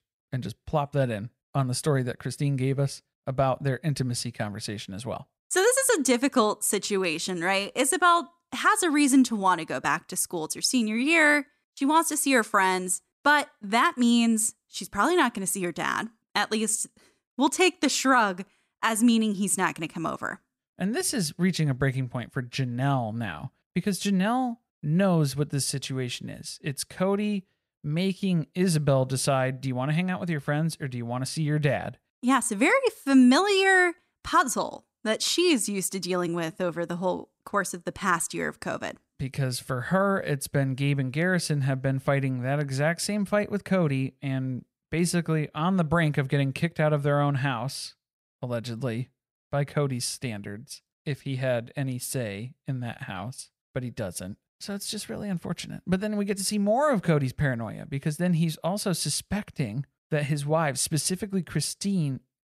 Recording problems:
none

